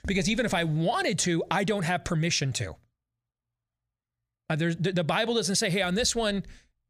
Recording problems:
none

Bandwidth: 15 kHz